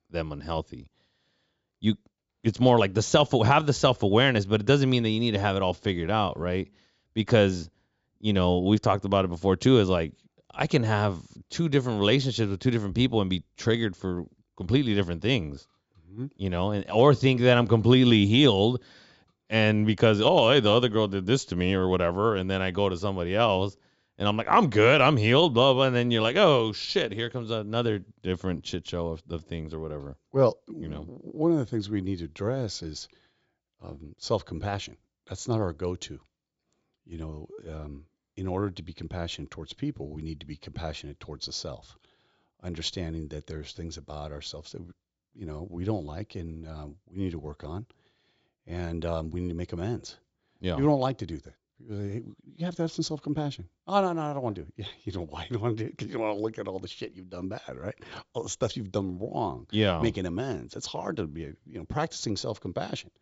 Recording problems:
high frequencies cut off; noticeable; nothing above 8 kHz

